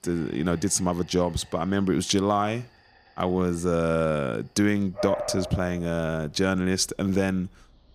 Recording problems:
animal sounds; noticeable; throughout; 10 dB below the speech

